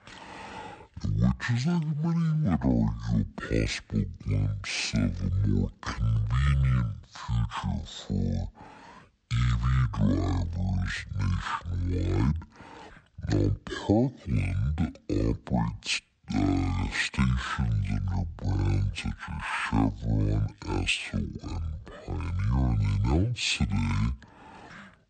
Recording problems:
wrong speed and pitch; too slow and too low; 0.5 times normal speed

